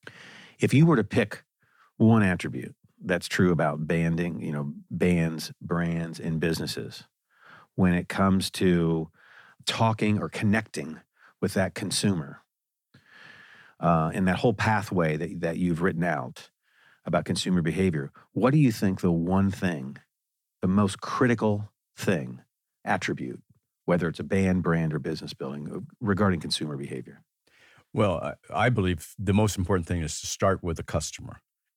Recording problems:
none

